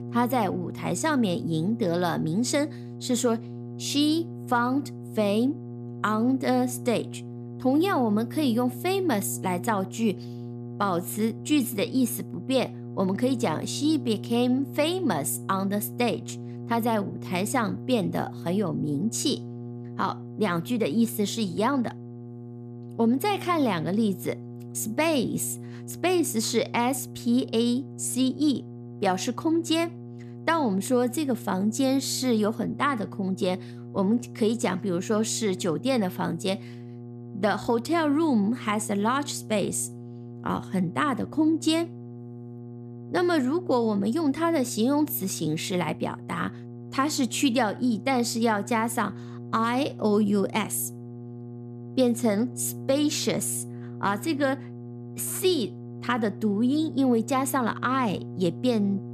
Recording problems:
electrical hum; noticeable; throughout; 60 Hz, 20 dB below the speech

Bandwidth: 14.5 kHz